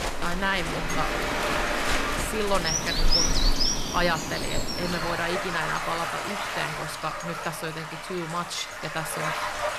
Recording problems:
animal sounds; very loud; until 5 s; 3 dB above the speech
rain or running water; loud; throughout; as loud as the speech
household noises; noticeable; throughout; 15 dB below the speech

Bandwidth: 14 kHz